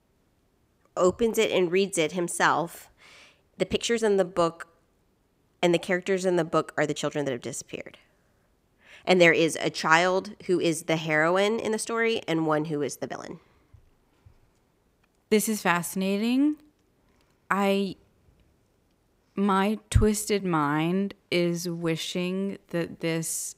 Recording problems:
uneven, jittery; strongly; from 1 to 23 s

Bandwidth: 15.5 kHz